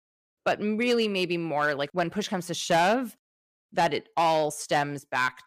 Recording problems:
distortion; slight; 4% of the sound clipped

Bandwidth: 15 kHz